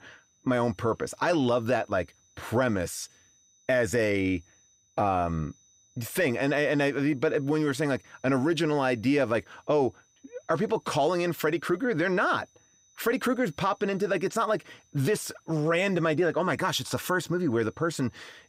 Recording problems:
high-pitched whine; faint; throughout; 6 kHz, 35 dB below the speech

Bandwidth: 15.5 kHz